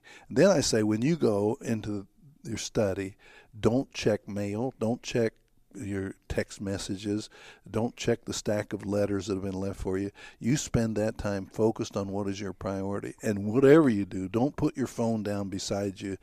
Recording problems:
none

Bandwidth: 14.5 kHz